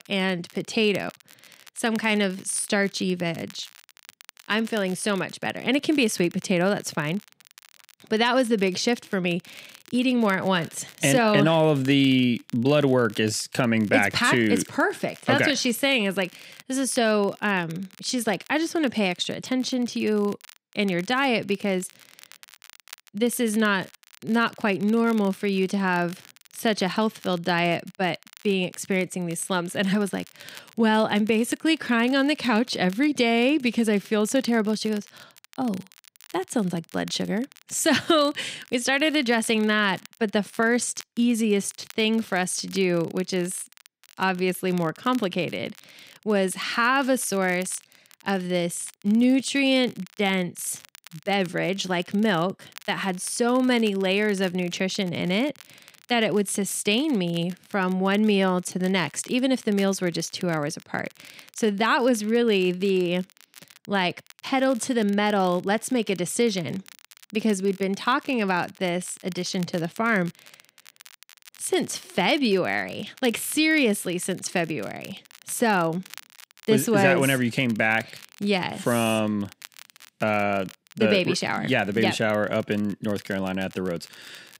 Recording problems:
crackle, like an old record; faint; 25 dB below the speech

